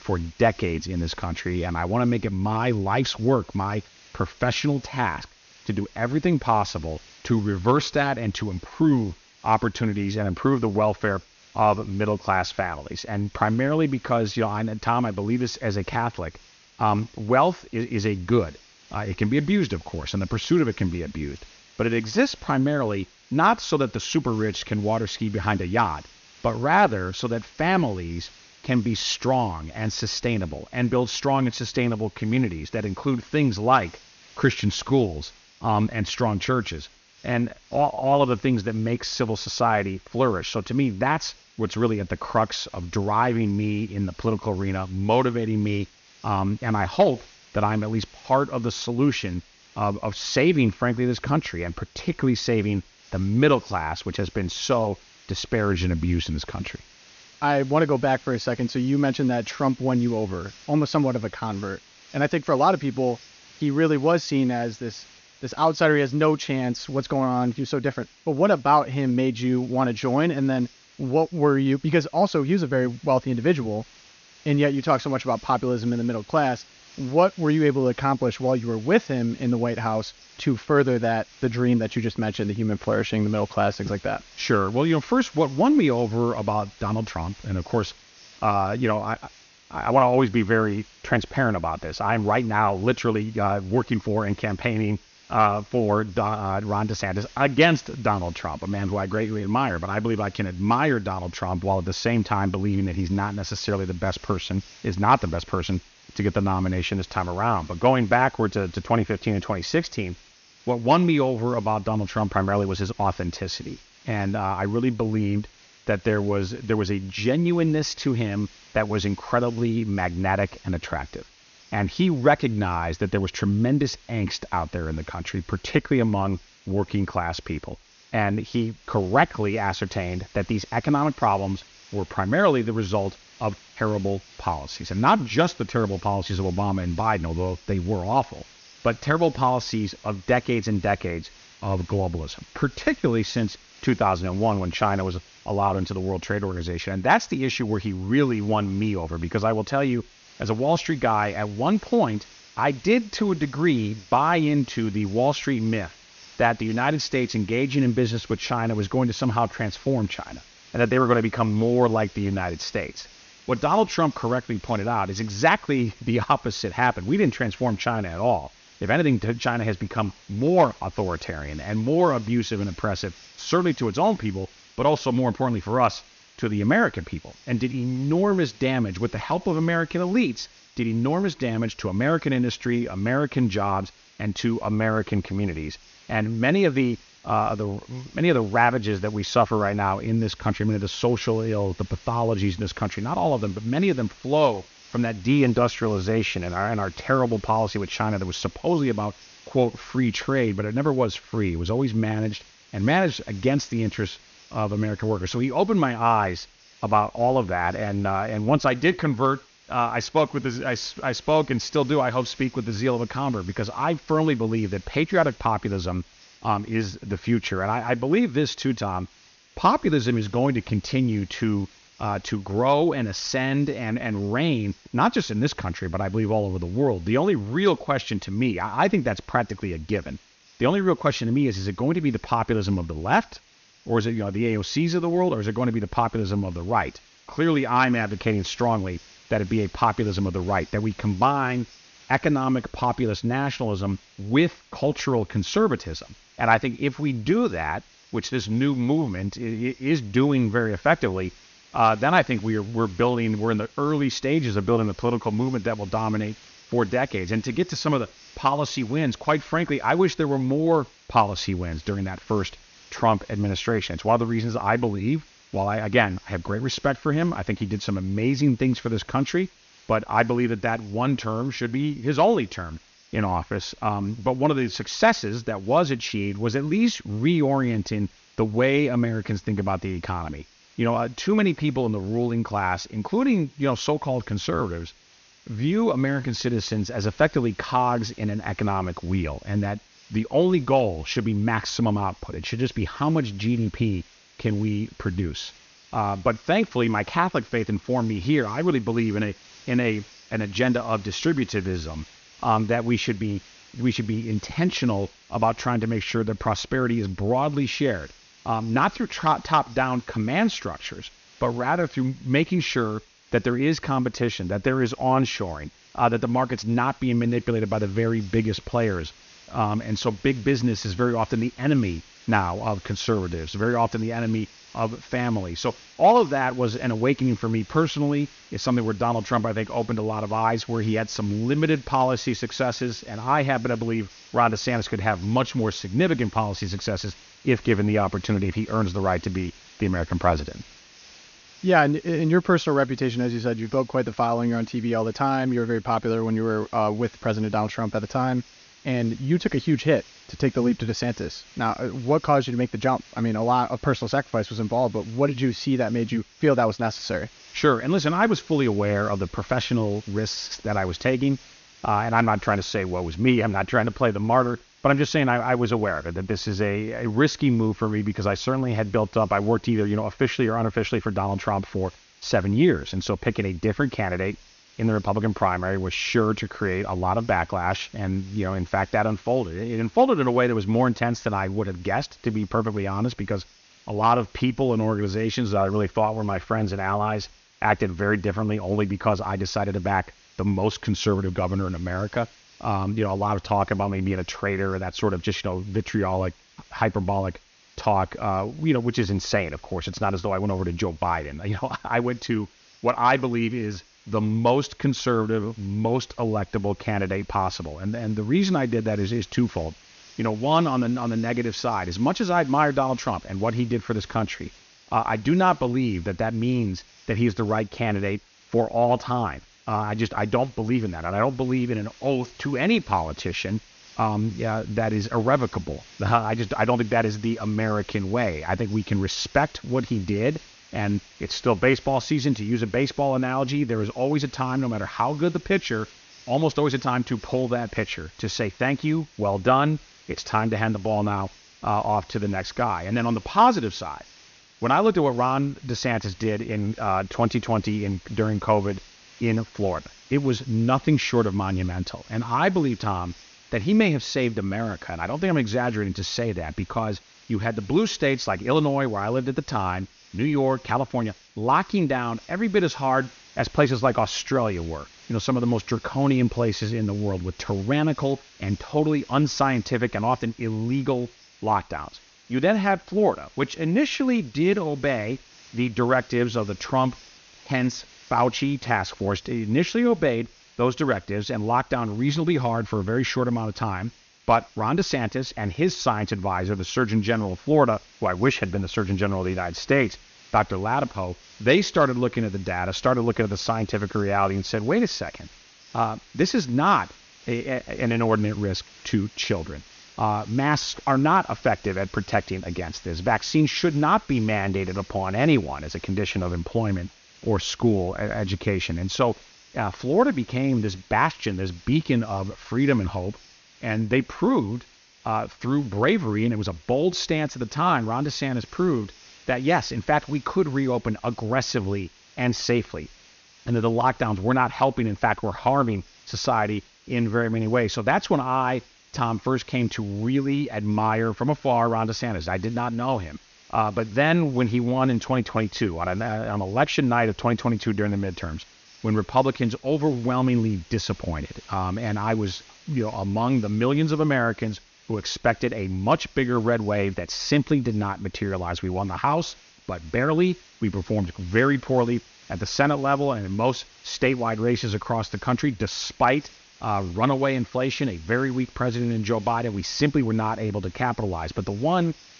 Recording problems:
high frequencies cut off; noticeable; nothing above 6.5 kHz
hiss; faint; throughout; 25 dB below the speech

